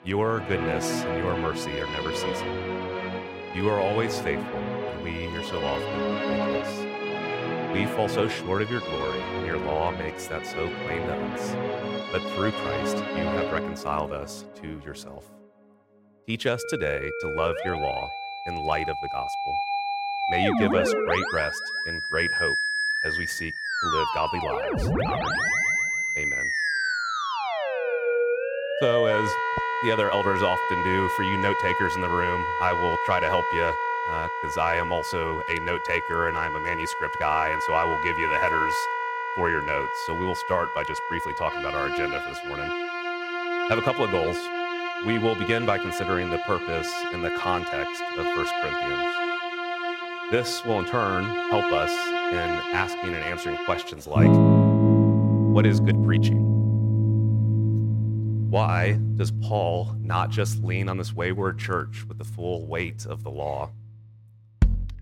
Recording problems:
background music; very loud; throughout; 3 dB above the speech

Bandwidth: 16.5 kHz